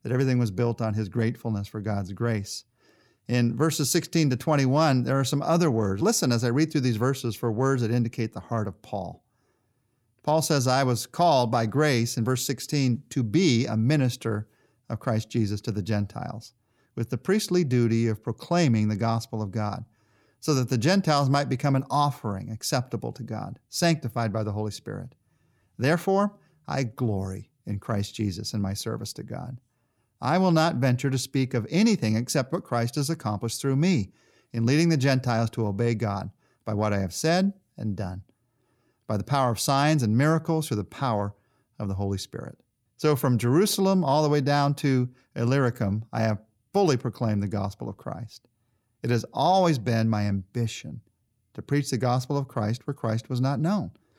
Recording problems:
none

